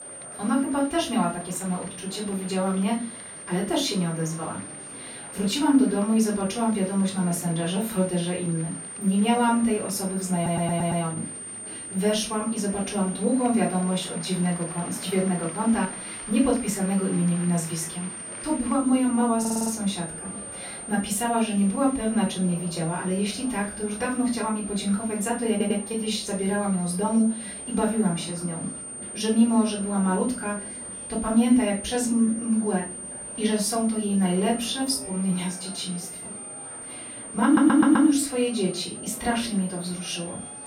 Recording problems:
off-mic speech; far
room echo; slight; dies away in 0.3 s
high-pitched whine; noticeable; throughout; 9 kHz, 10 dB below the speech
murmuring crowd; noticeable; throughout; 20 dB below the speech
audio stuttering; 4 times, first at 10 s

